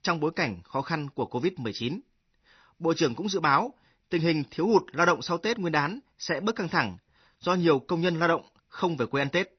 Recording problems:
garbled, watery; slightly; nothing above 6 kHz

